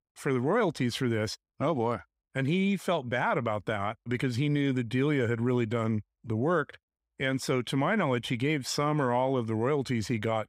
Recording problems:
none

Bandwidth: 15.5 kHz